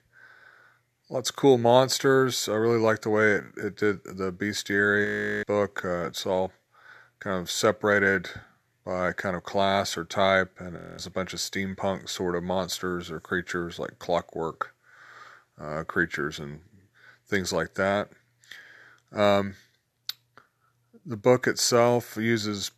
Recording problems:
audio freezing; at 5 s and at 11 s

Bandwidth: 13.5 kHz